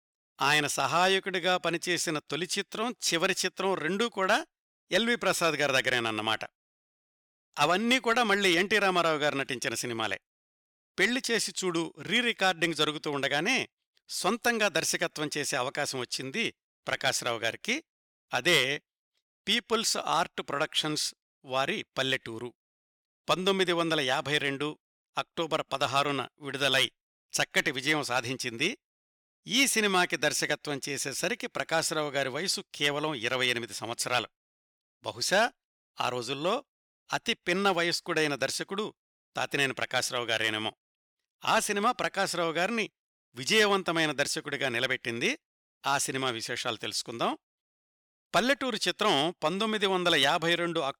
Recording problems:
none

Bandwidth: 18.5 kHz